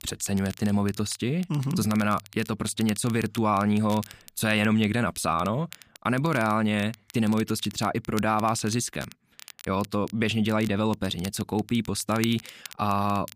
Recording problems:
crackle, like an old record; noticeable; 20 dB below the speech

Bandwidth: 15 kHz